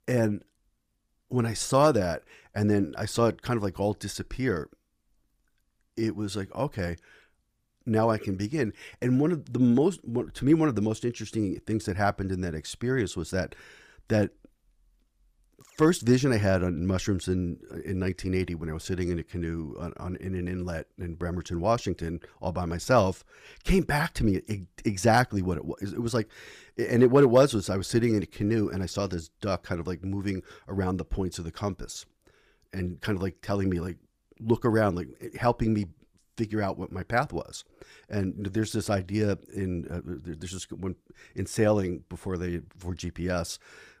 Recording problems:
none

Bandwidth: 15 kHz